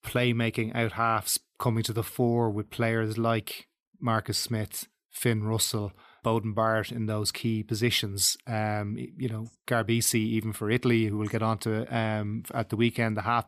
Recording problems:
none

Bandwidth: 14.5 kHz